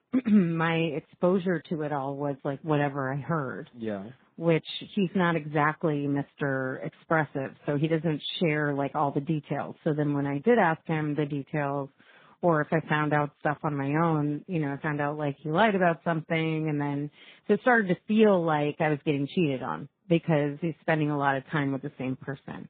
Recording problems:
garbled, watery; badly; nothing above 4 kHz
high frequencies cut off; slight

